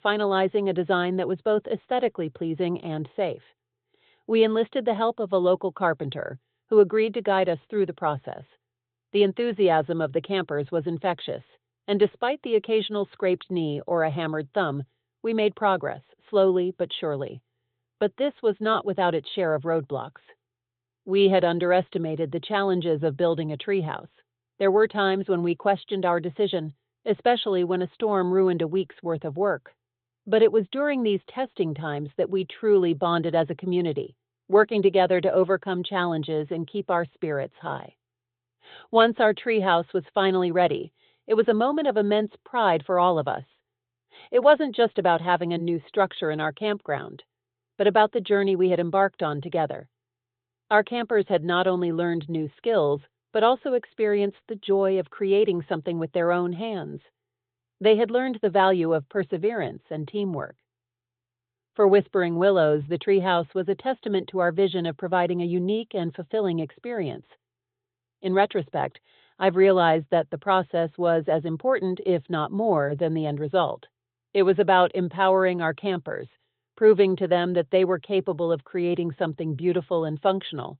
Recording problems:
high frequencies cut off; severe; nothing above 4 kHz

